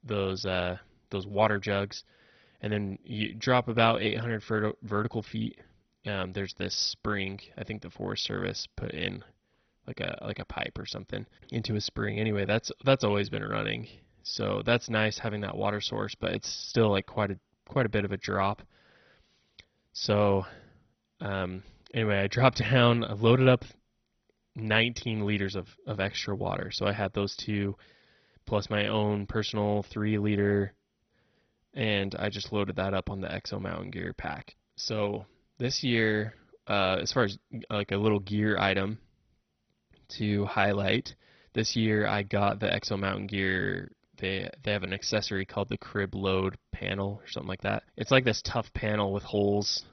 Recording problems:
garbled, watery; badly; nothing above 6 kHz

